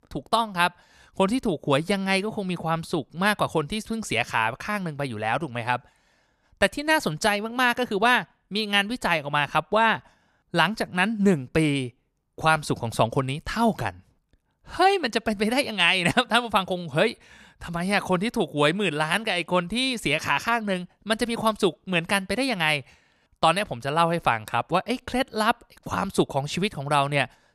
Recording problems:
none

